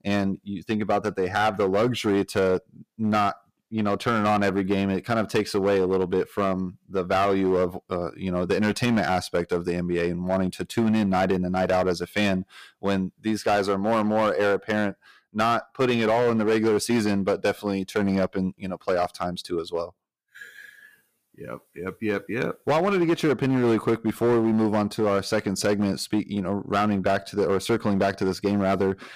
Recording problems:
distortion; slight; 8% of the sound clipped

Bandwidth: 15 kHz